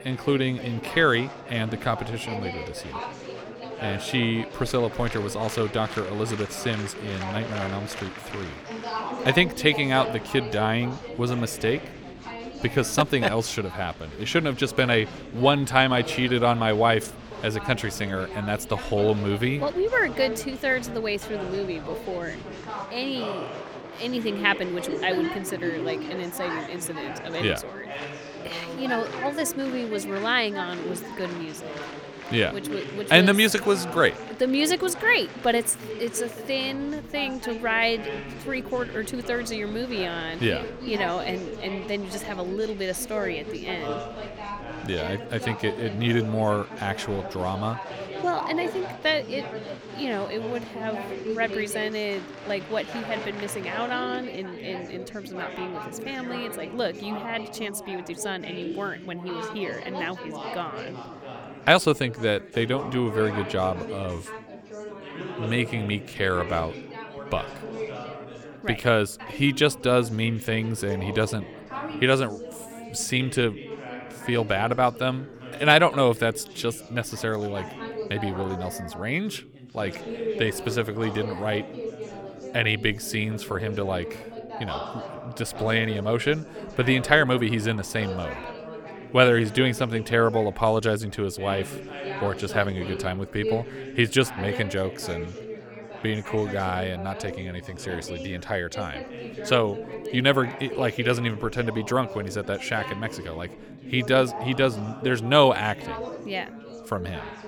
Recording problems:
chatter from many people; noticeable; throughout; 10 dB below the speech

